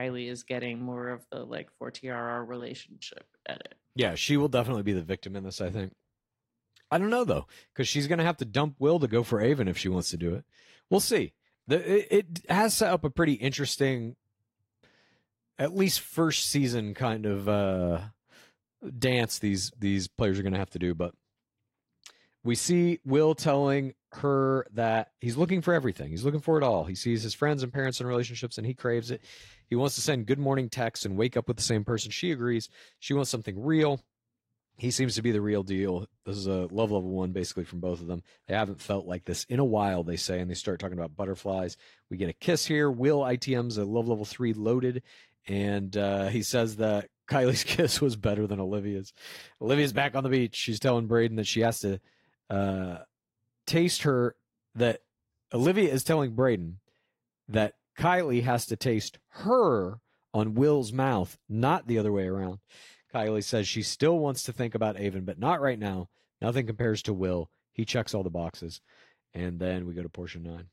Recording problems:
garbled, watery; slightly; nothing above 16 kHz
abrupt cut into speech; at the start

